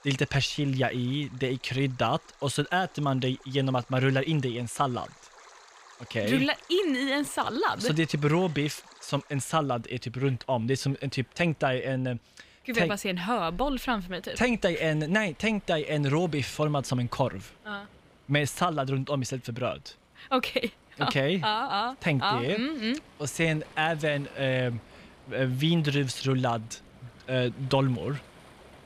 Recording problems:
rain or running water; faint; throughout; 25 dB below the speech

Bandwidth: 15 kHz